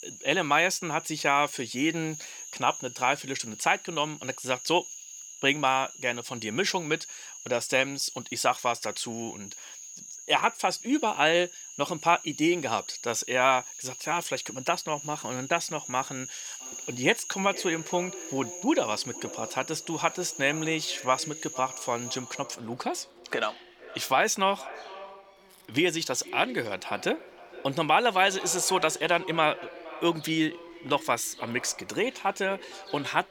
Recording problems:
echo of what is said; noticeable; from 17 s on; 460 ms later, 15 dB below the speech
thin; somewhat; fading below 600 Hz
animal sounds; noticeable; throughout; 10 dB below the speech

